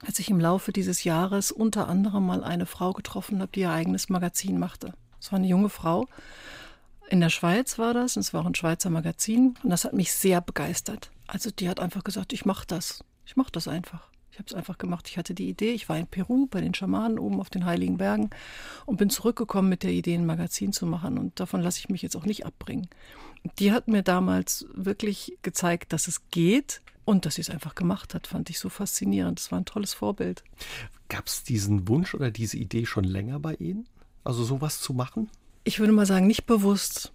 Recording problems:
none

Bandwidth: 15.5 kHz